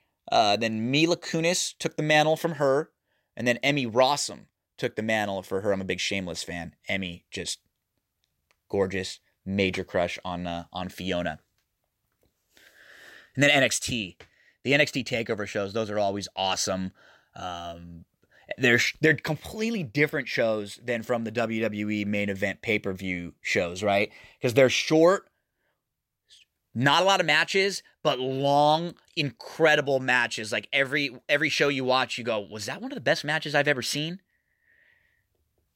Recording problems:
none

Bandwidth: 16 kHz